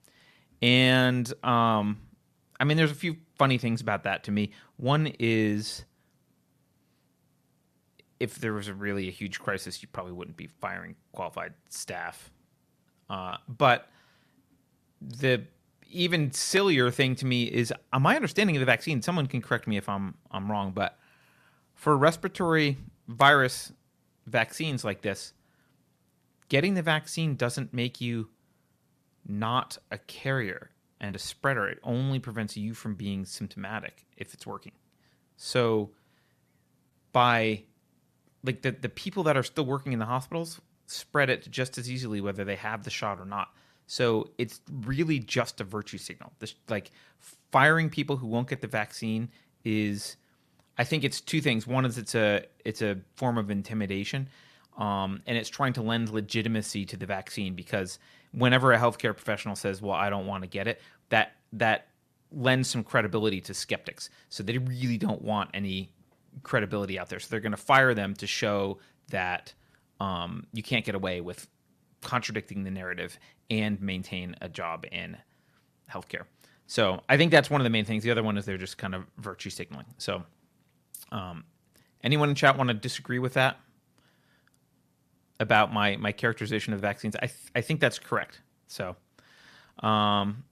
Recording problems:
none

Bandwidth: 14.5 kHz